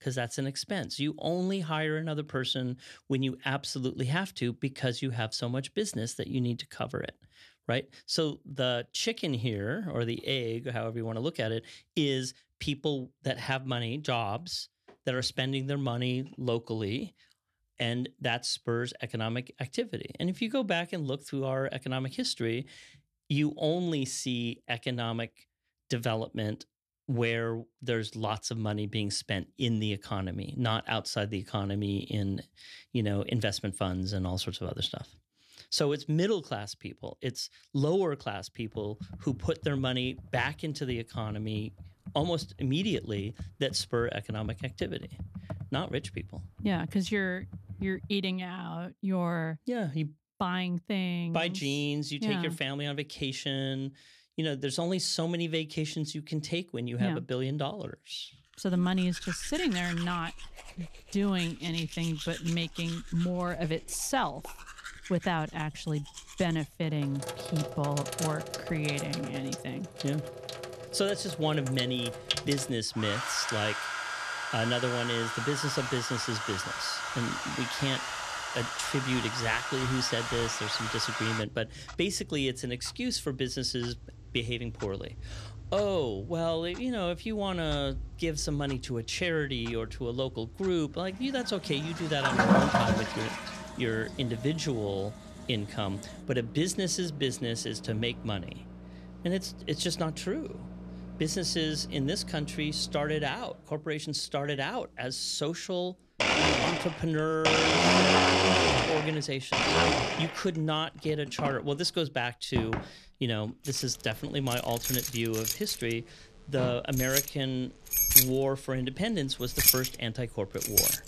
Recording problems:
household noises; very loud; from 59 s on; 2 dB above the speech
keyboard typing; noticeable; from 39 to 48 s; peak 9 dB below the speech

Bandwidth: 13.5 kHz